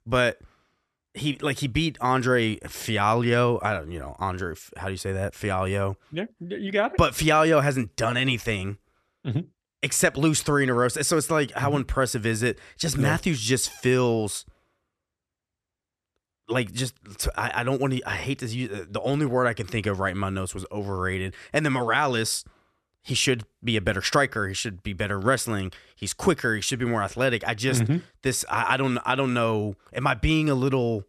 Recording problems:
none

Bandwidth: 13.5 kHz